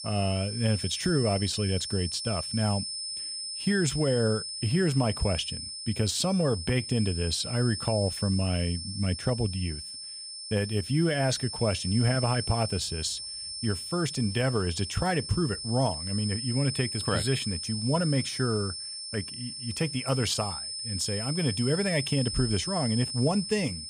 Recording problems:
high-pitched whine; loud; throughout; 5 kHz, 5 dB below the speech

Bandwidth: 15.5 kHz